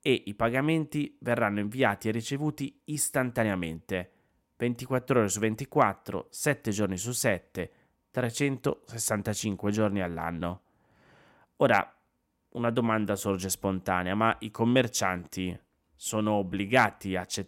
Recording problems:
none

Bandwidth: 16 kHz